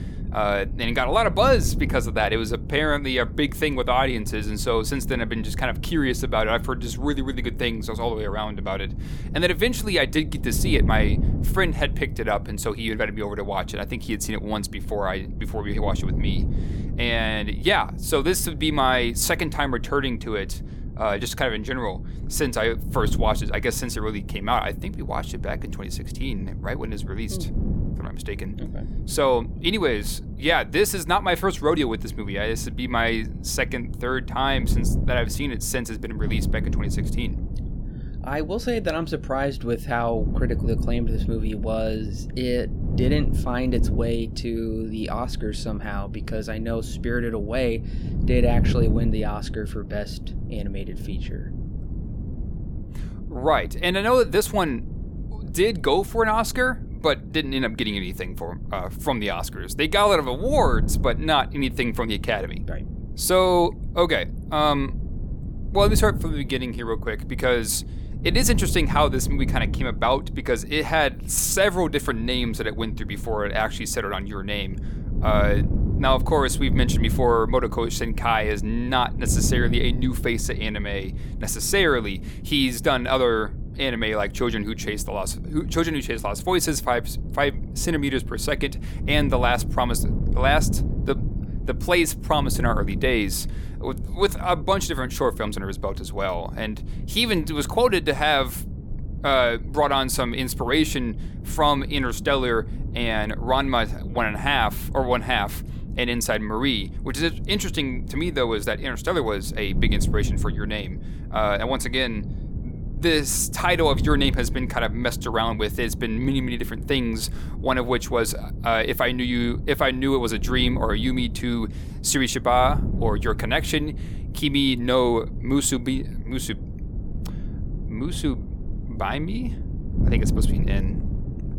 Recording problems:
wind noise on the microphone; occasional gusts; 15 dB below the speech

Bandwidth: 17.5 kHz